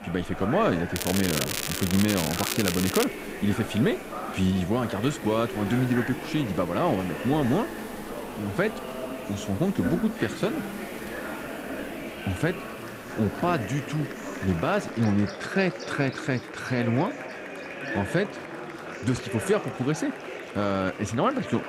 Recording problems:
murmuring crowd; loud; throughout; 9 dB below the speech
crackling; loud; from 1 to 3 s; 2 dB below the speech
animal sounds; noticeable; throughout; 15 dB below the speech

